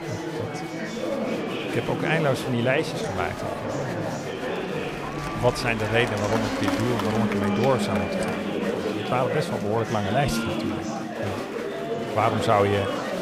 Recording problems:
murmuring crowd; loud; throughout; 2 dB below the speech

